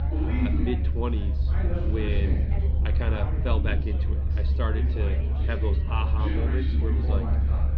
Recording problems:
muffled; slightly; fading above 4 kHz
chatter from many people; loud; throughout; 2 dB below the speech
low rumble; loud; throughout; 8 dB below the speech

